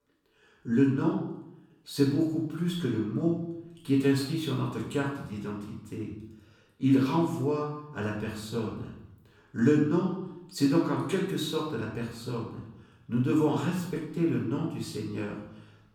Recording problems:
off-mic speech; far
room echo; noticeable; dies away in 0.7 s

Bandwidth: 17.5 kHz